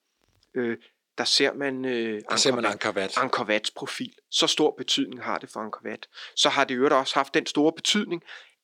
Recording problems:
thin; somewhat; fading below 250 Hz

